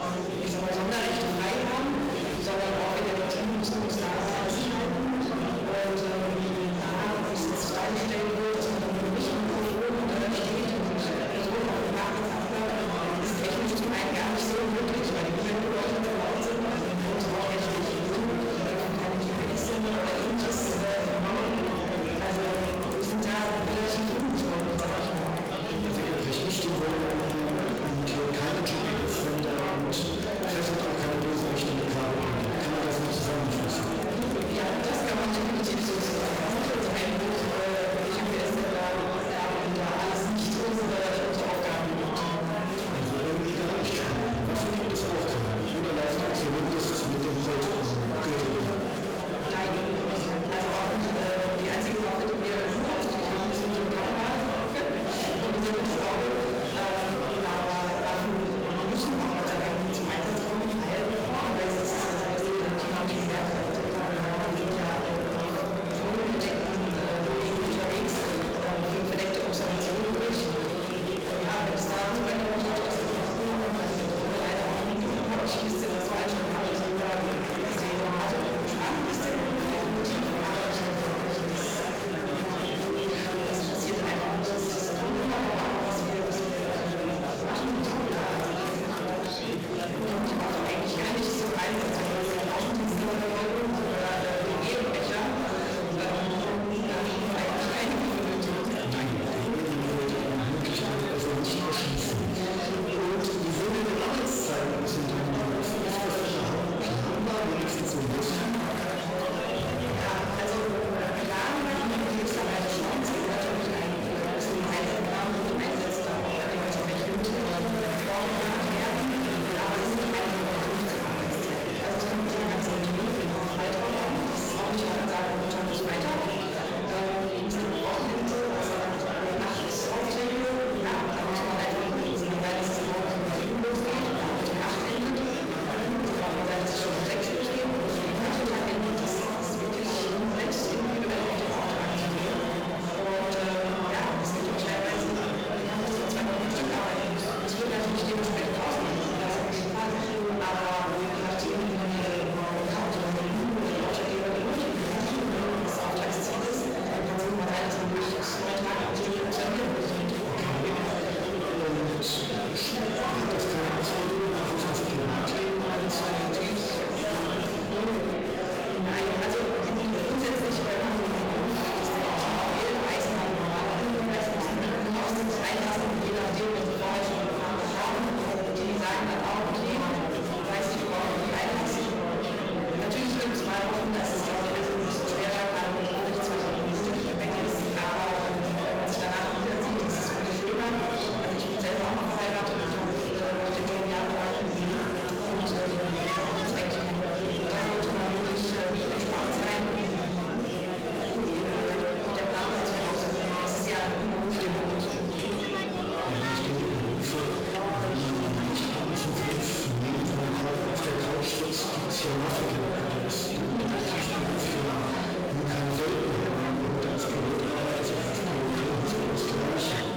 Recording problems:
distortion; heavy; 45% of the sound clipped
off-mic speech; far
room echo; noticeable; dies away in 1.1 s
murmuring crowd; loud; throughout; as loud as the speech

